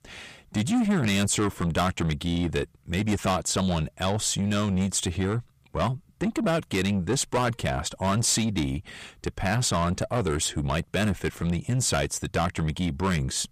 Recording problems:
distortion; heavy; 7 dB below the speech

